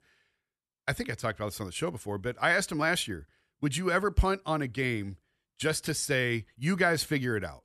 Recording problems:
none

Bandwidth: 13.5 kHz